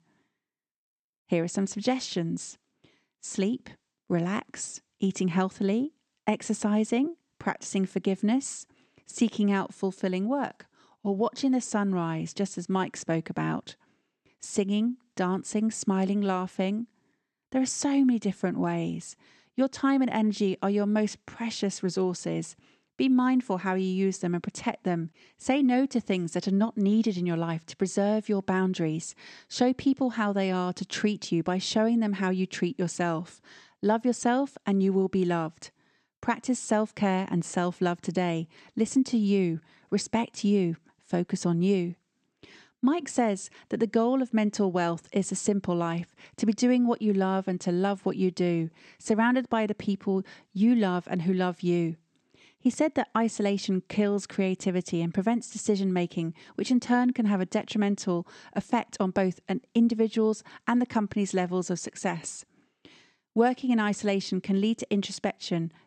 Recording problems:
none

